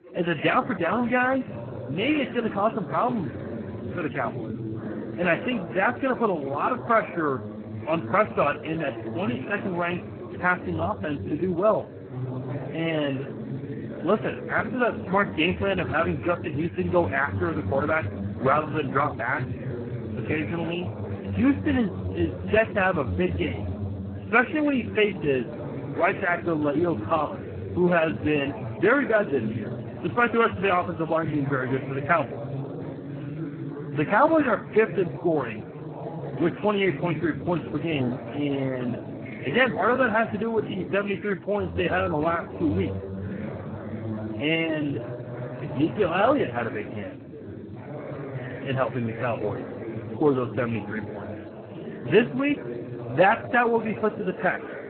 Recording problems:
garbled, watery; badly
background chatter; loud; throughout; 4 voices, 9 dB below the speech

